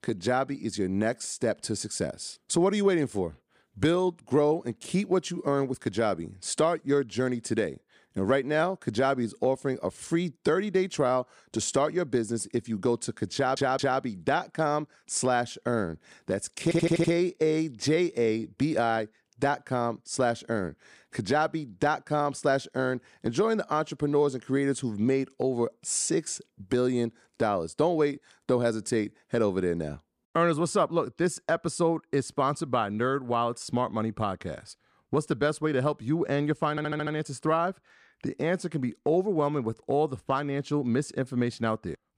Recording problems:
audio stuttering; at 13 s, at 17 s and at 37 s

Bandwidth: 15 kHz